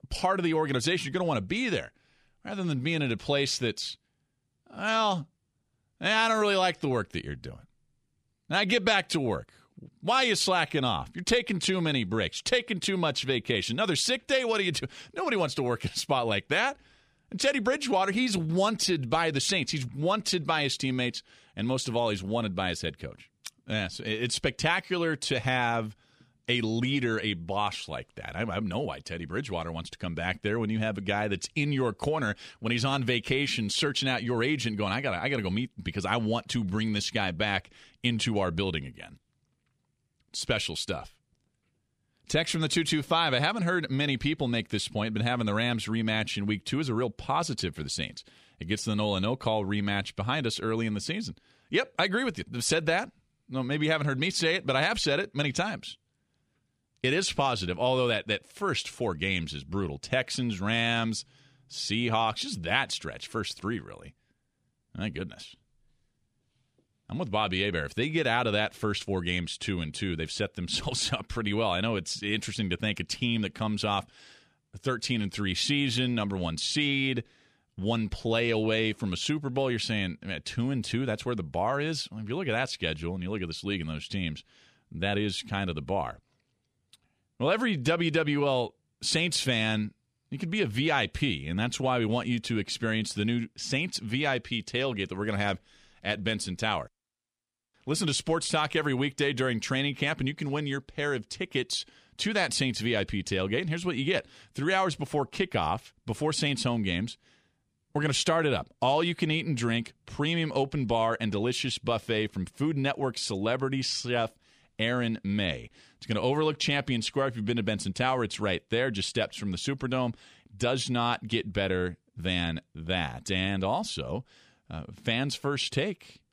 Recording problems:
none

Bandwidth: 15 kHz